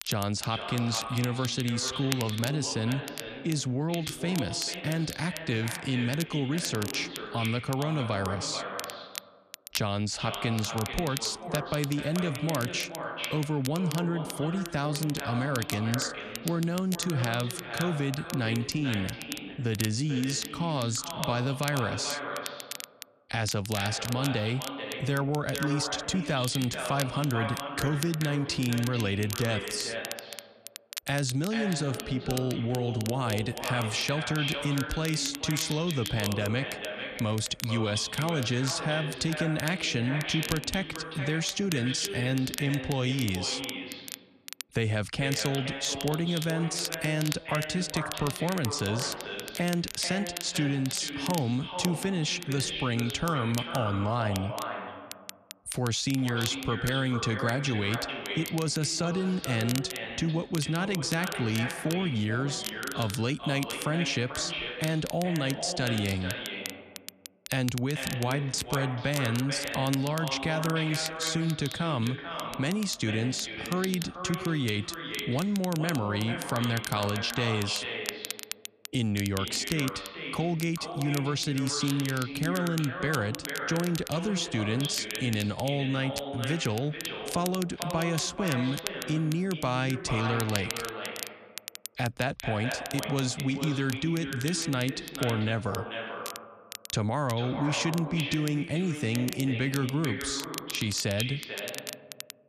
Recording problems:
echo of what is said; strong; throughout; 440 ms later, 7 dB below the speech
crackle, like an old record; noticeable; 10 dB below the speech

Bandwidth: 14 kHz